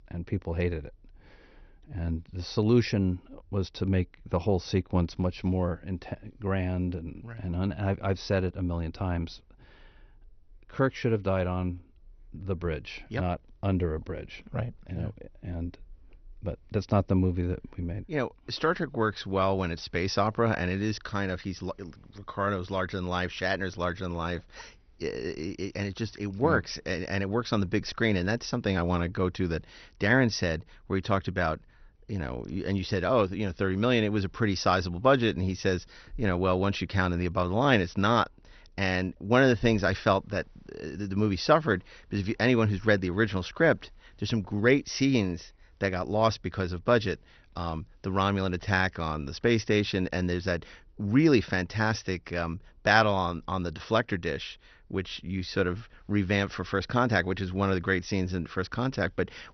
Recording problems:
garbled, watery; slightly; nothing above 6 kHz

